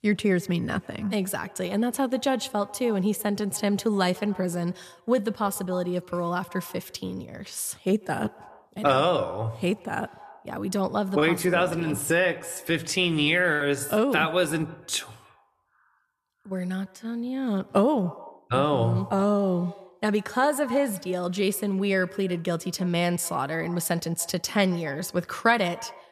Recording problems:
echo of what is said; faint; throughout; 140 ms later, 20 dB below the speech

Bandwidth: 14.5 kHz